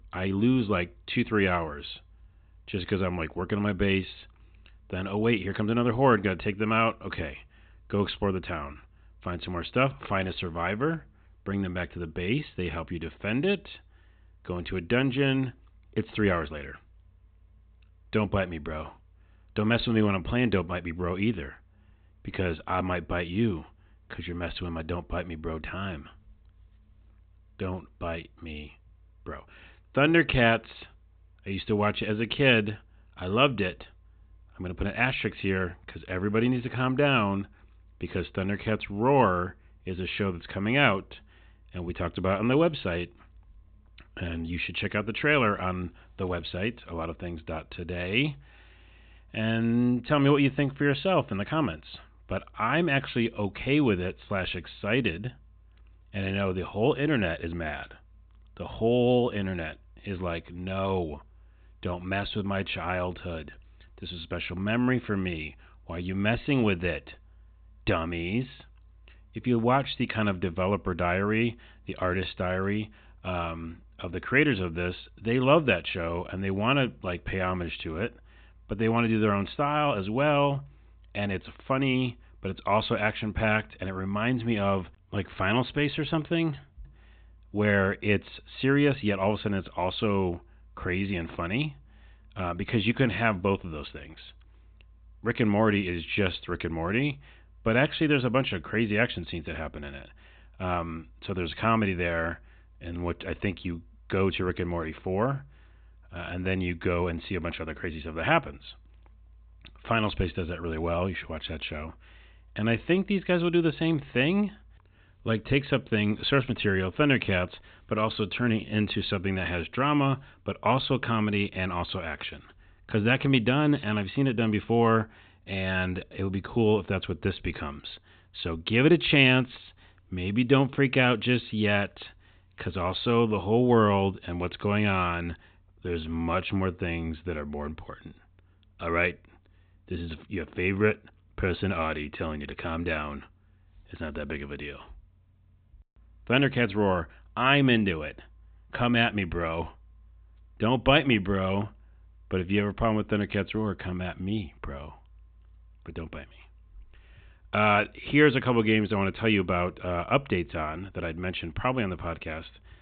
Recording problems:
high frequencies cut off; severe; nothing above 4 kHz

